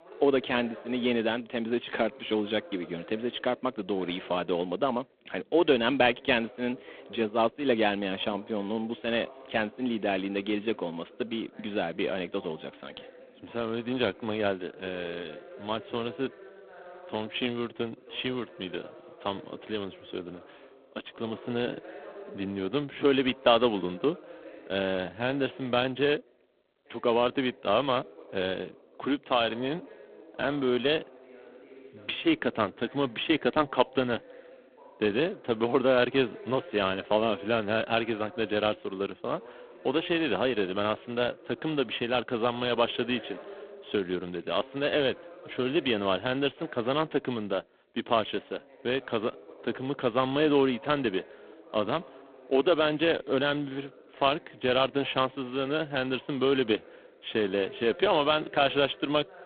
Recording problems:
phone-call audio; poor line
voice in the background; faint; throughout; 20 dB below the speech

